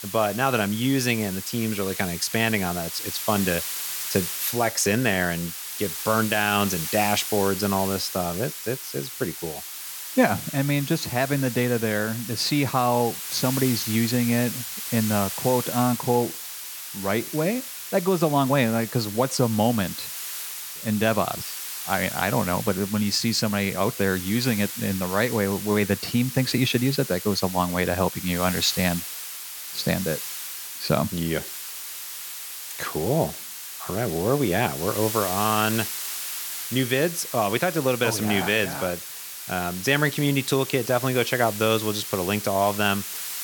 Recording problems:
hiss; loud; throughout; 7 dB below the speech

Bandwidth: 17.5 kHz